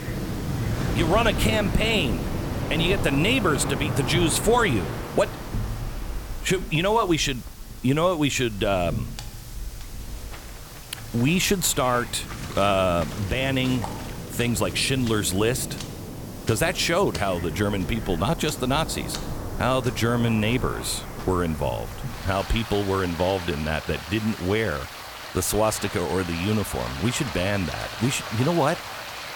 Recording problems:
rain or running water; loud; throughout; 9 dB below the speech
hiss; faint; throughout; 20 dB below the speech

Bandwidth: 18 kHz